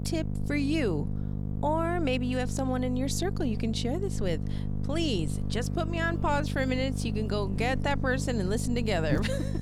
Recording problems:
electrical hum; noticeable; throughout; 50 Hz, 10 dB below the speech

